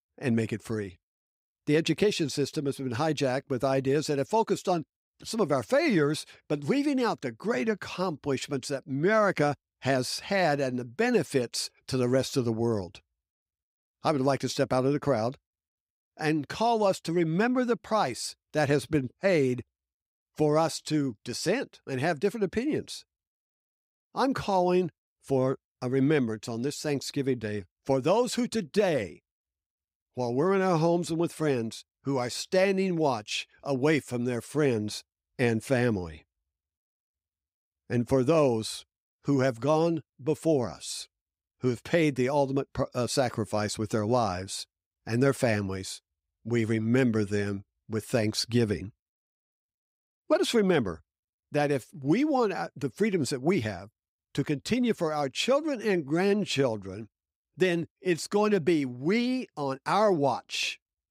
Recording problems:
none

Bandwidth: 15.5 kHz